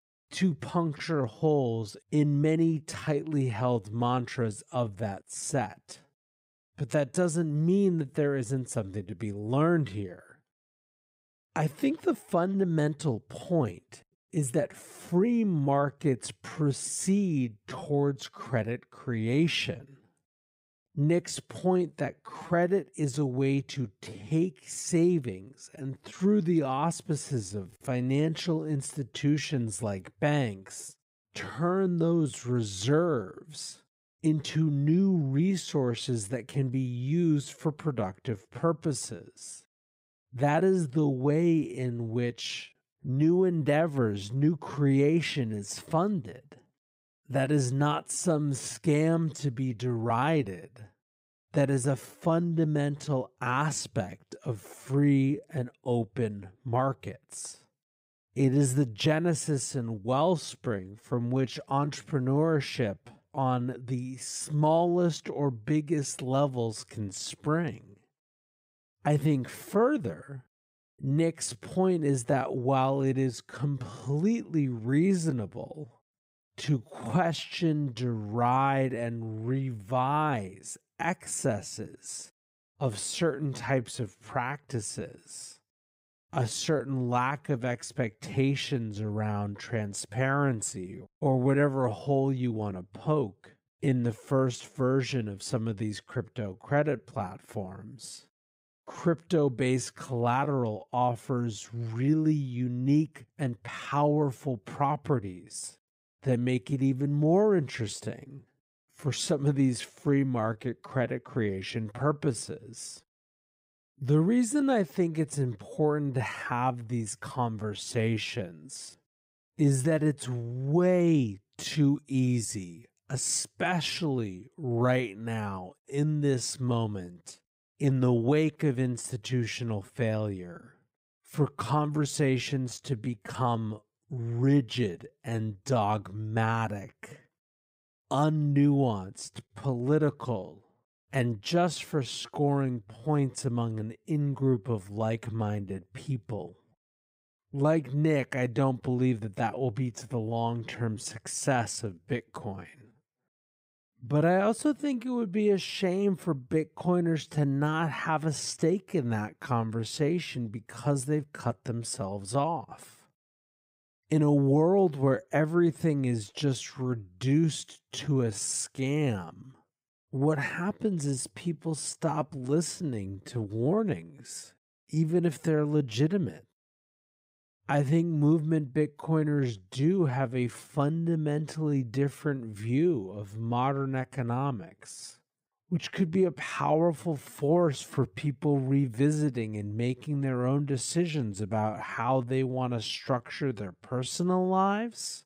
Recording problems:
wrong speed, natural pitch; too slow; 0.6 times normal speed

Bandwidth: 15.5 kHz